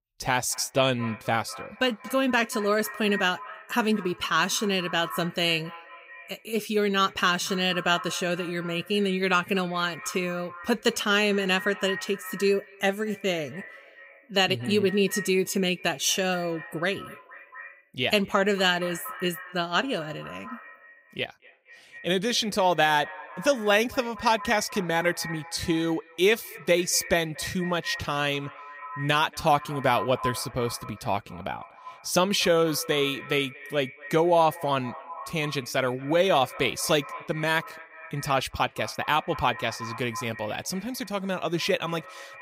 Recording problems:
echo of what is said; noticeable; throughout; 230 ms later, 15 dB below the speech

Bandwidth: 15.5 kHz